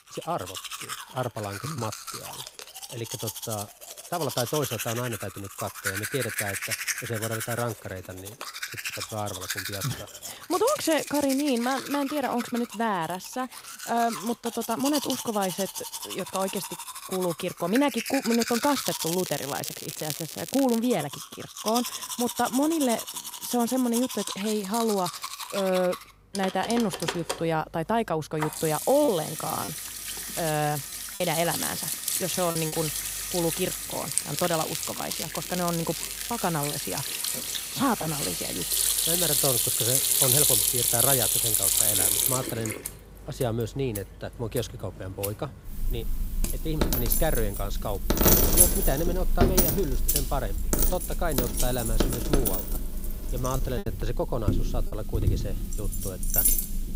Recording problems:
household noises; very loud; throughout; 2 dB above the speech
crackling; loud; from 18 to 21 s and from 34 to 36 s; 5 dB below the speech
choppy; very; from 29 to 33 s and at 53 s; 7% of the speech affected

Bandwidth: 15.5 kHz